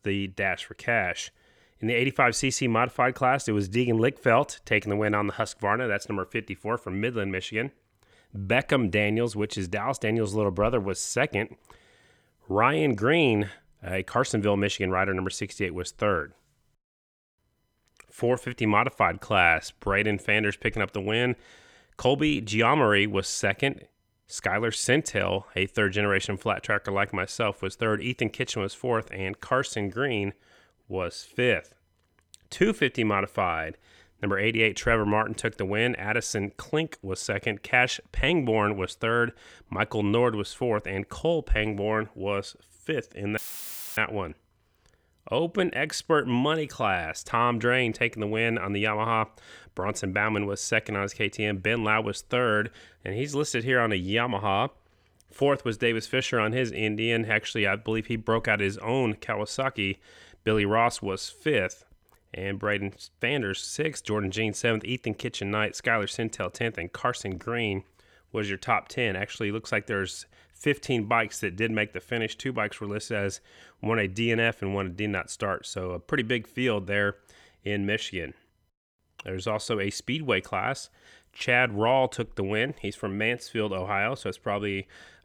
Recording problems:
audio cutting out; filled with static; at 43 s for 0.5 s

